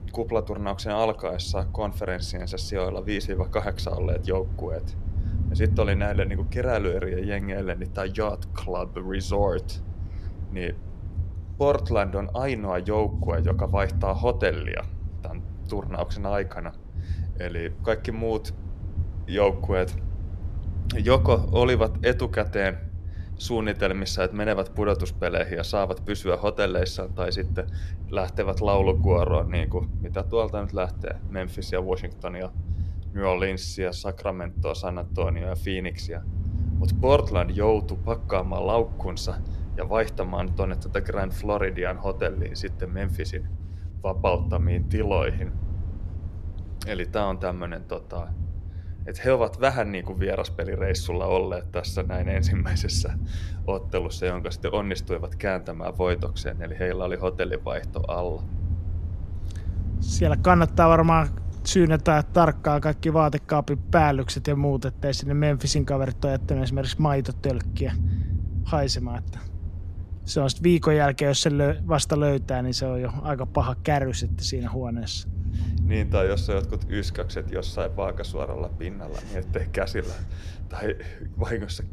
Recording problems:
low rumble; noticeable; throughout; 20 dB below the speech

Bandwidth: 14 kHz